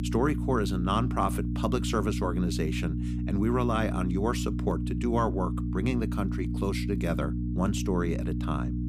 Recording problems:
electrical hum; loud; throughout; 60 Hz, 8 dB below the speech

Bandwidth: 15.5 kHz